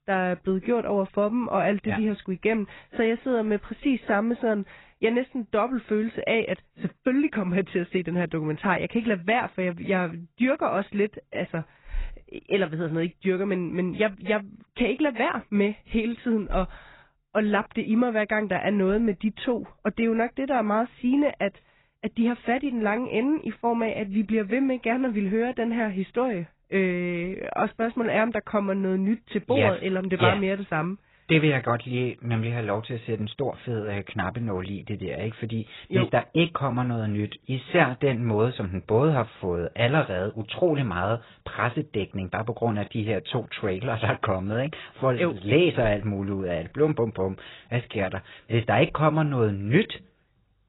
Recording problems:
garbled, watery; badly; nothing above 4 kHz

